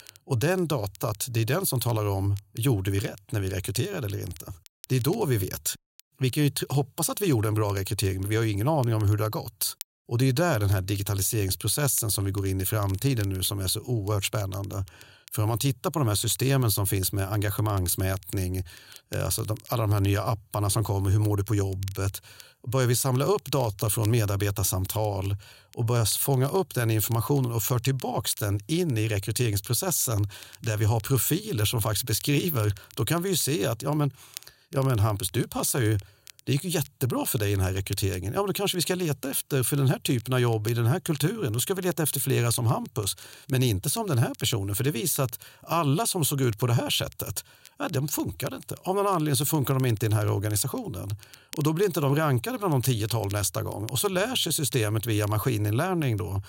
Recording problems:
crackle, like an old record; faint; 25 dB below the speech

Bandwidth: 16 kHz